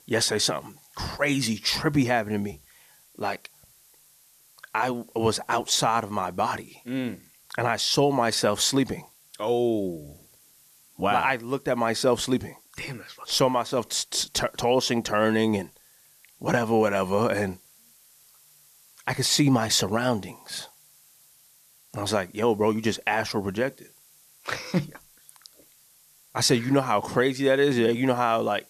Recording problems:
hiss; faint; throughout; 30 dB below the speech

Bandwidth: 14 kHz